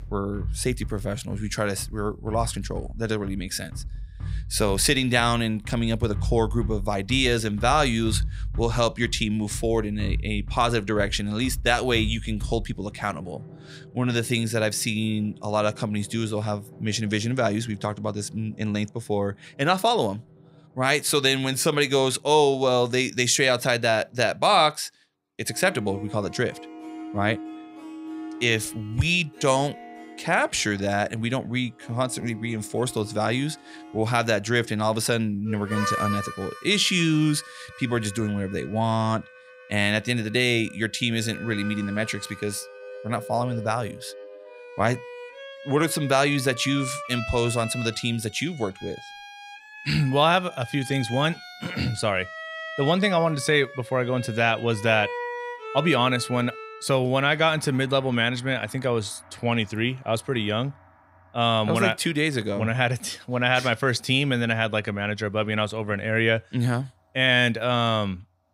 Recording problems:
background music; noticeable; throughout; 15 dB below the speech

